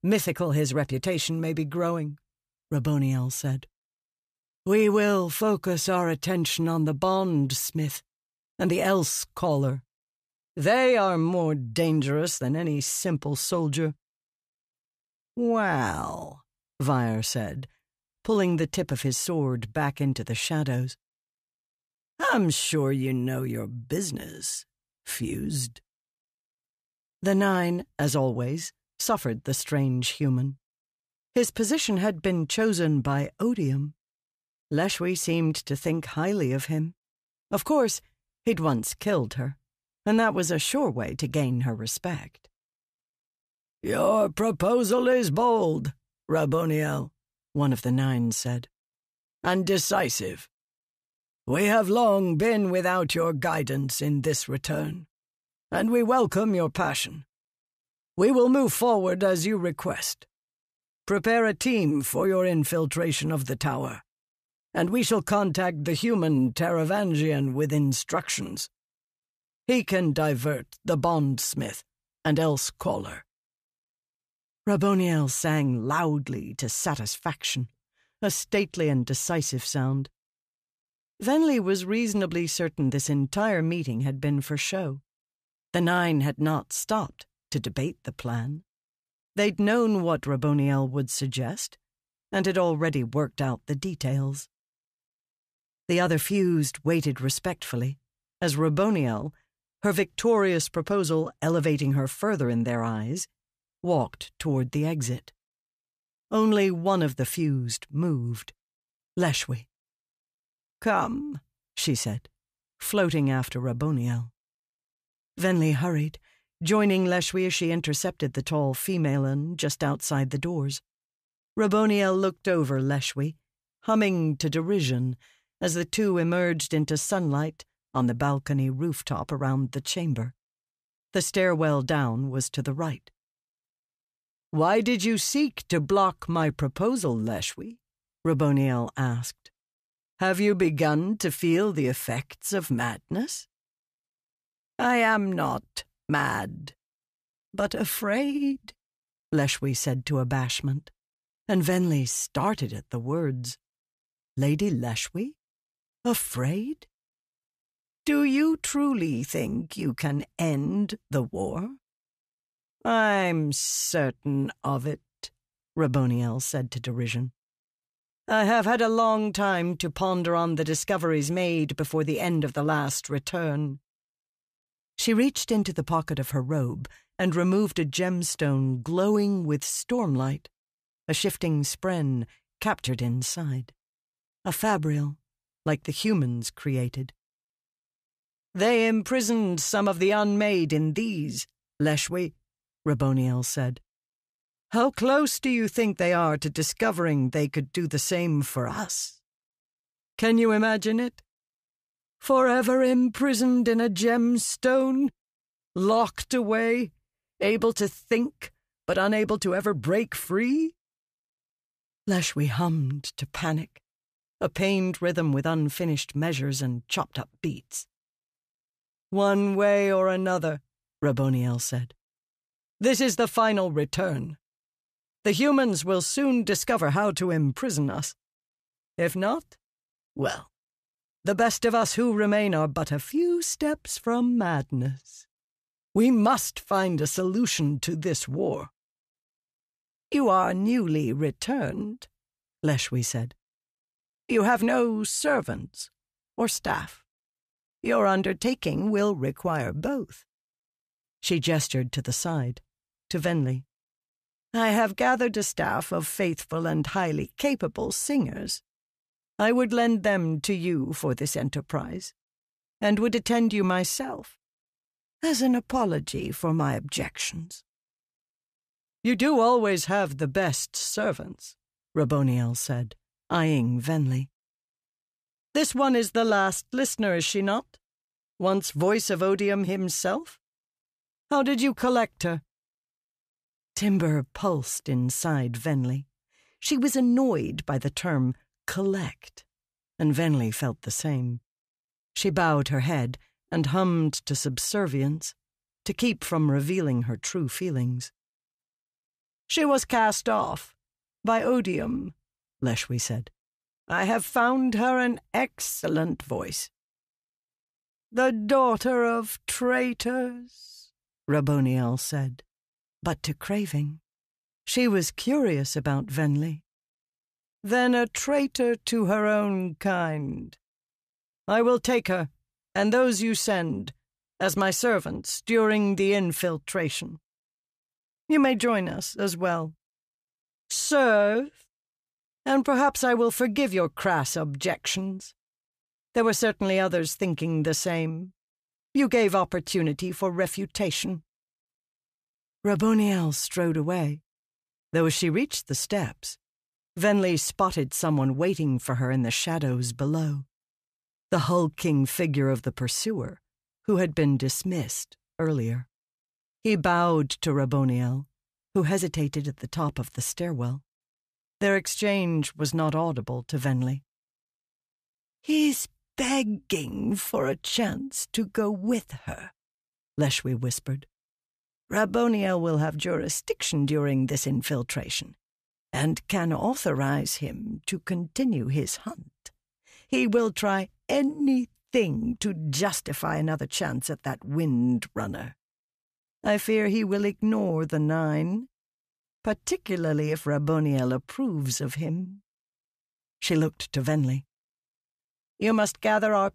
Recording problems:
none

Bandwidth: 14.5 kHz